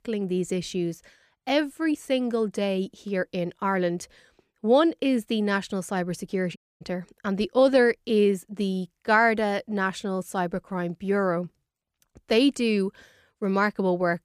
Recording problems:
audio cutting out; at 6.5 s

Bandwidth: 15 kHz